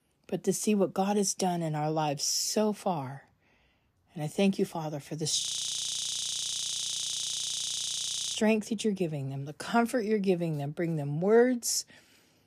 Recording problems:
audio freezing; at 5.5 s for 3 s

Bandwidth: 14.5 kHz